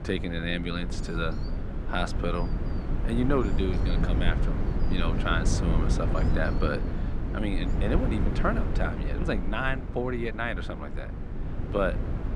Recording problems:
muffled; very slightly; fading above 4 kHz
wind noise on the microphone; heavy; 7 dB below the speech
animal sounds; faint; throughout; 25 dB below the speech

